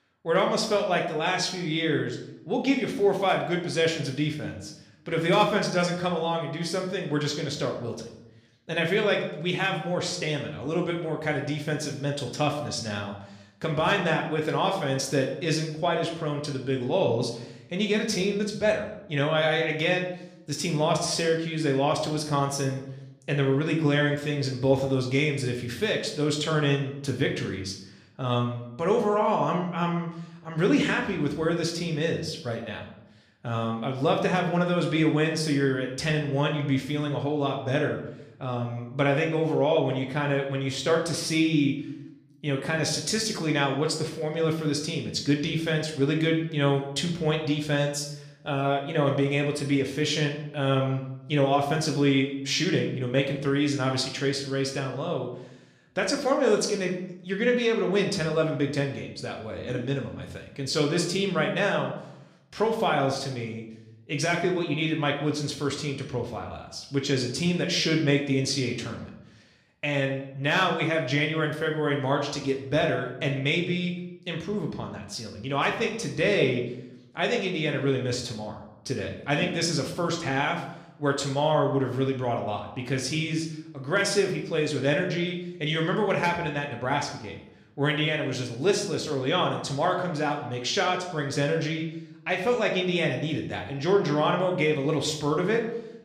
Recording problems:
room echo; slight; dies away in 0.6 s
off-mic speech; somewhat distant

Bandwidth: 14.5 kHz